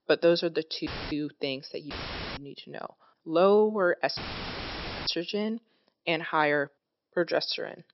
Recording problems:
high frequencies cut off; noticeable; nothing above 5.5 kHz
audio cutting out; filled with static; at 1 s, at 2 s and at 4 s for 1 s

